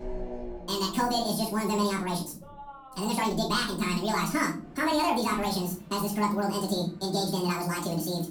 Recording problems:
off-mic speech; far
wrong speed and pitch; too fast and too high; 1.7 times normal speed
room echo; slight; dies away in 0.4 s
traffic noise; noticeable; throughout; 20 dB below the speech

